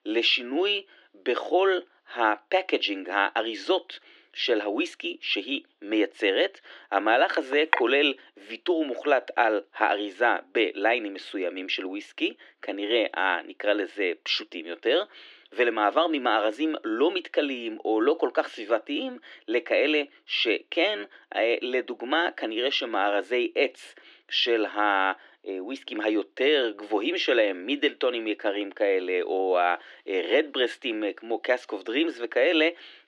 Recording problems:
thin; somewhat; fading below 300 Hz
muffled; very slightly; fading above 2.5 kHz
clattering dishes; noticeable; at 7.5 s; peak level with the speech

